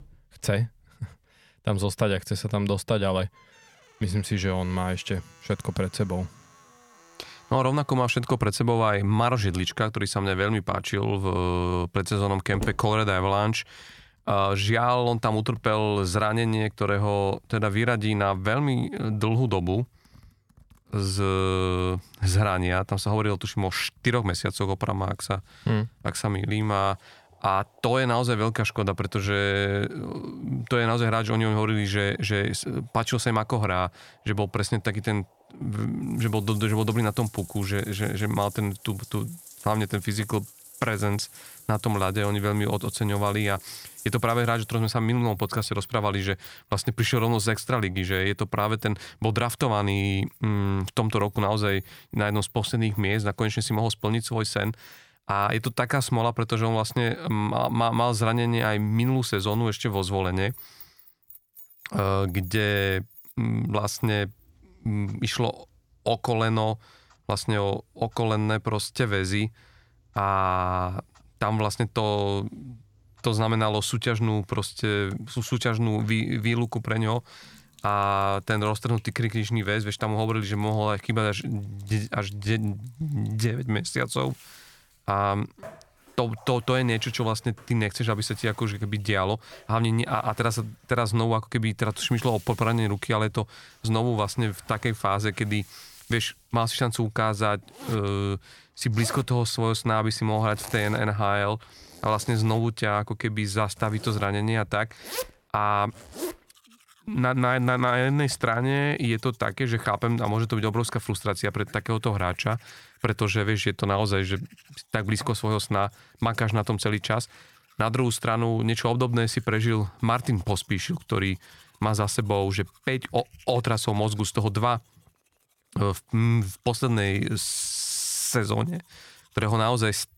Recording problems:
household noises; faint; throughout; 20 dB below the speech

